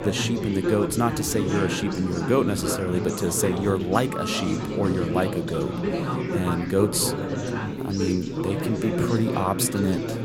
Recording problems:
chatter from many people; loud; throughout; 2 dB below the speech

